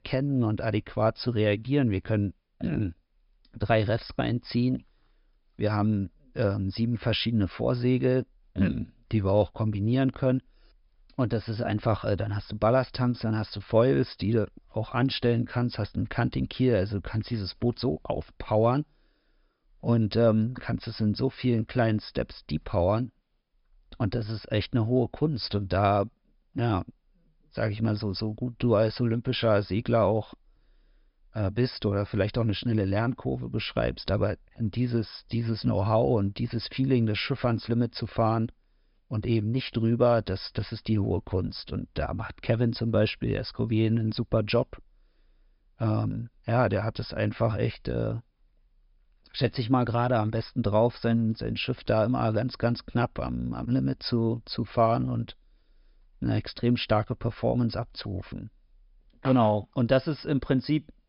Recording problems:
high frequencies cut off; noticeable; nothing above 5.5 kHz

